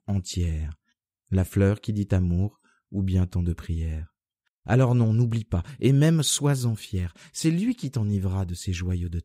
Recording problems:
none

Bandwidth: 15.5 kHz